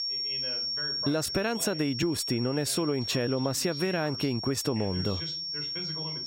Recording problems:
squashed, flat; somewhat, background pumping
high-pitched whine; loud; throughout; 5.5 kHz, 4 dB below the speech
voice in the background; noticeable; throughout; 15 dB below the speech

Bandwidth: 16 kHz